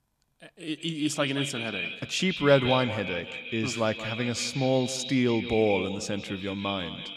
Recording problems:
echo of what is said; strong; throughout; 180 ms later, 6 dB below the speech

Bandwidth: 14.5 kHz